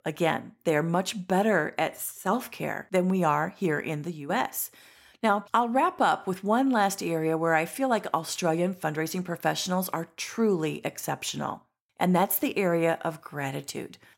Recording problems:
none

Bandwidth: 16 kHz